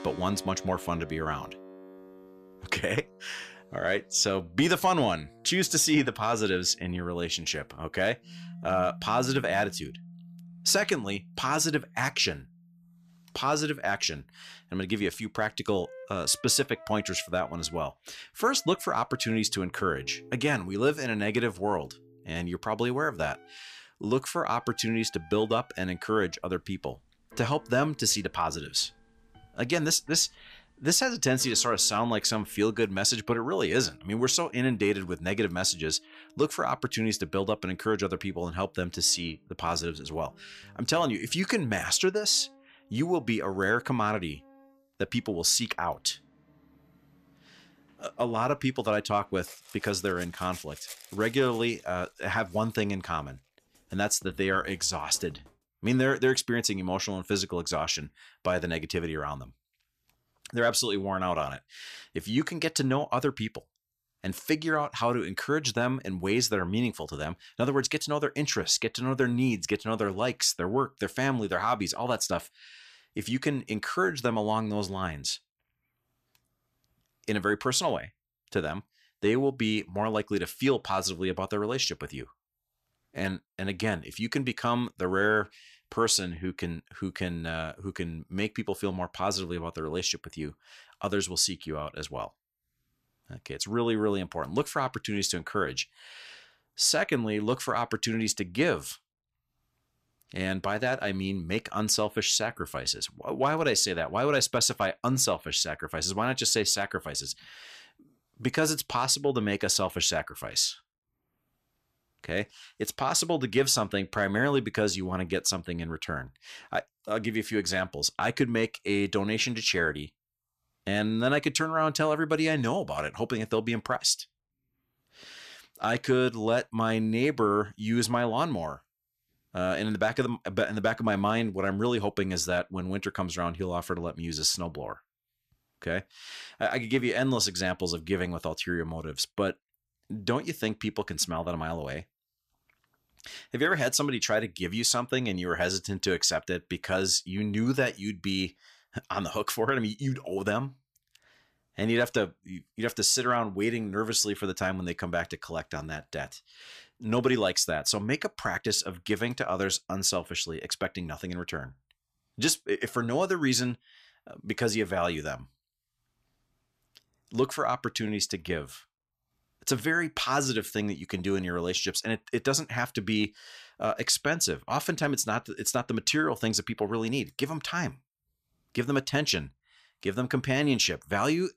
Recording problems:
background music; faint; until 56 s; 25 dB below the speech

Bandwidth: 14.5 kHz